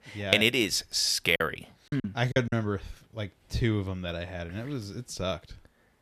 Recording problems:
choppy; very; from 1.5 to 2.5 s; 15% of the speech affected

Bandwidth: 14.5 kHz